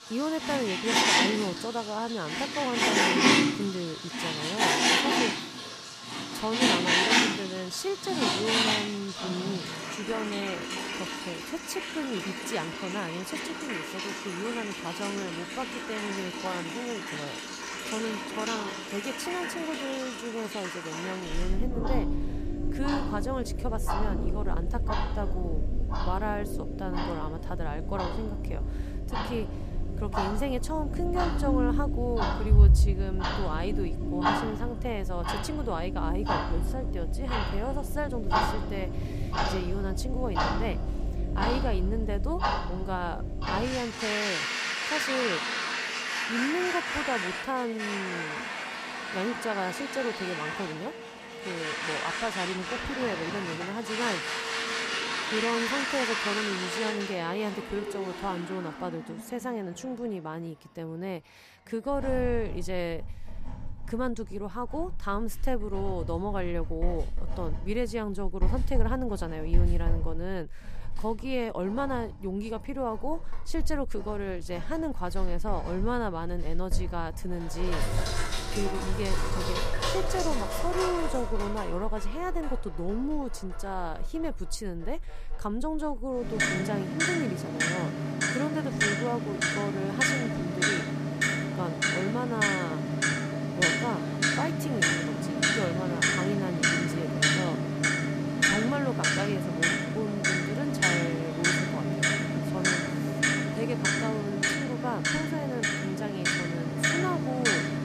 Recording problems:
household noises; very loud; throughout; 5 dB above the speech

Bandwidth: 15 kHz